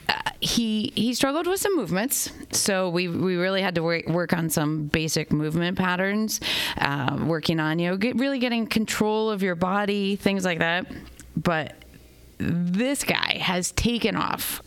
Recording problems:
squashed, flat; heavily

